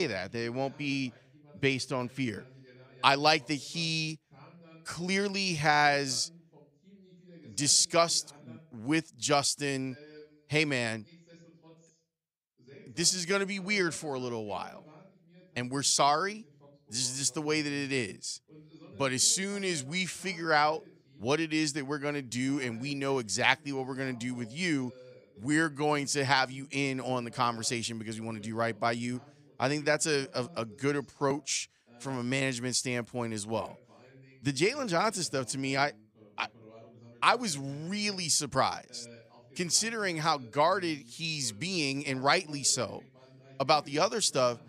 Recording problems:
voice in the background; faint; throughout; 25 dB below the speech
abrupt cut into speech; at the start

